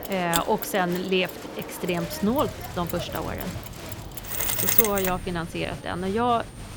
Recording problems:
machinery noise; very loud; throughout; 3 dB above the speech
crowd noise; noticeable; throughout; 10 dB below the speech
electrical hum; faint; throughout; 60 Hz, 30 dB below the speech

